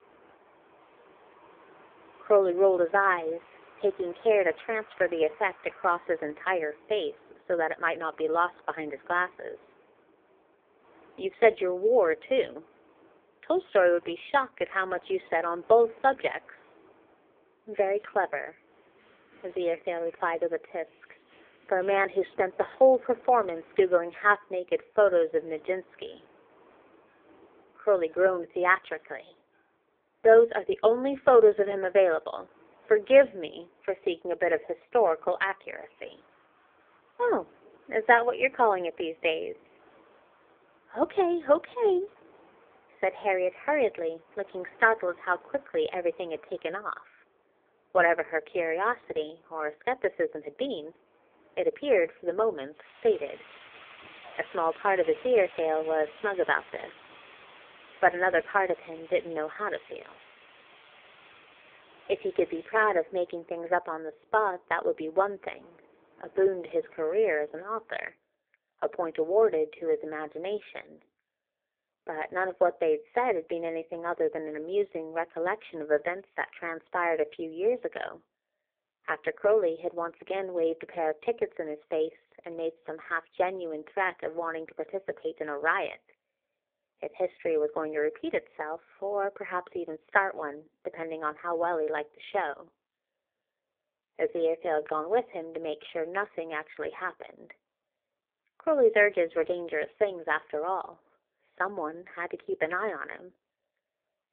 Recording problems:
phone-call audio; poor line; nothing above 3.5 kHz
wind in the background; faint; until 1:08; 25 dB below the speech

